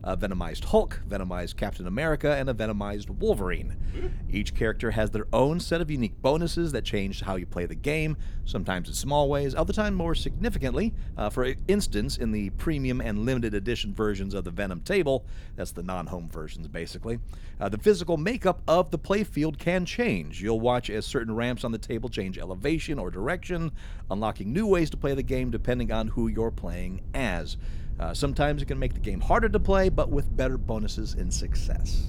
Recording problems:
low rumble; faint; throughout; 25 dB below the speech

